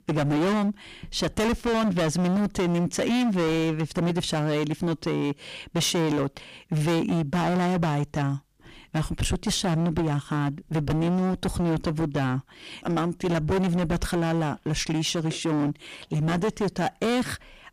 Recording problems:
distortion; heavy; 25% of the sound clipped

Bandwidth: 15 kHz